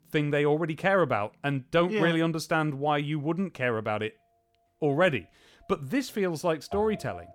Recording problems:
background music; noticeable; throughout; 20 dB below the speech

